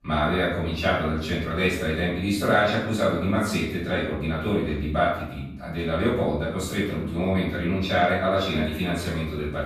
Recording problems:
off-mic speech; far
room echo; noticeable; dies away in 0.8 s

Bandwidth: 14 kHz